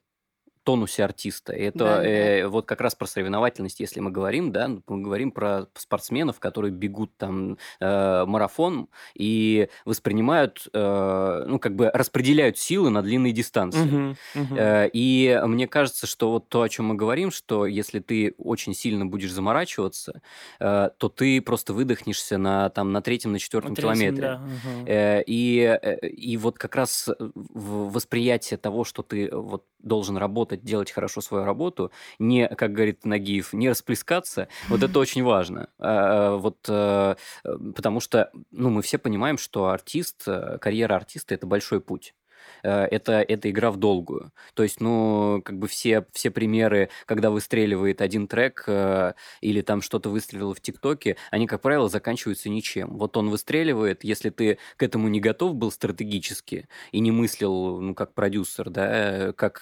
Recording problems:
none

